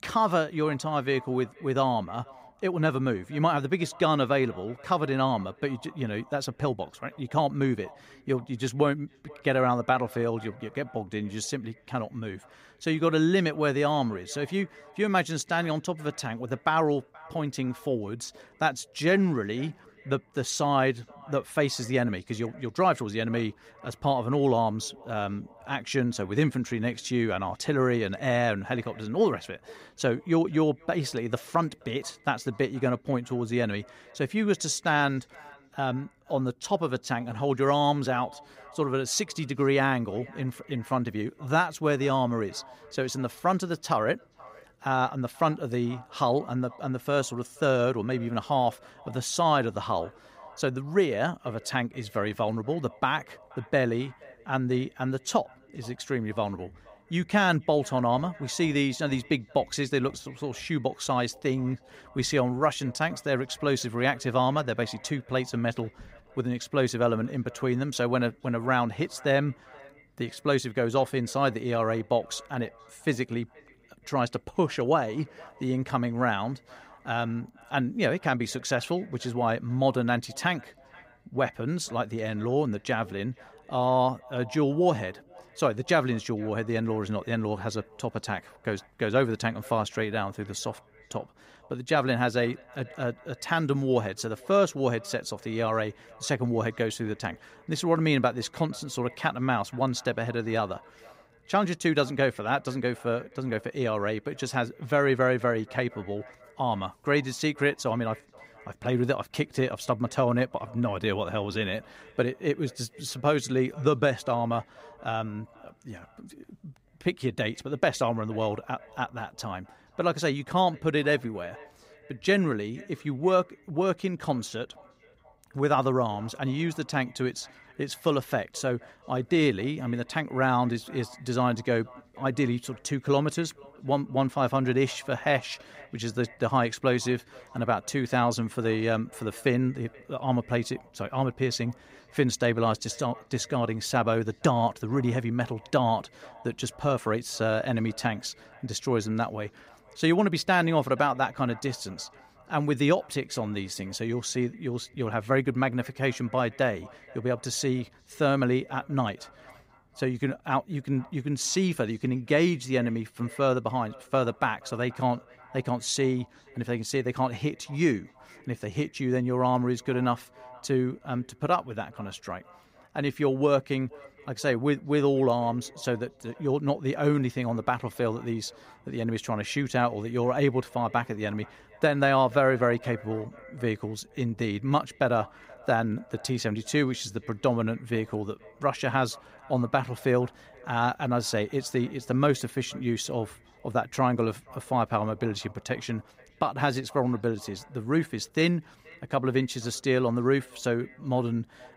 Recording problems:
echo of what is said; faint; throughout; 480 ms later, 25 dB below the speech

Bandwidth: 15.5 kHz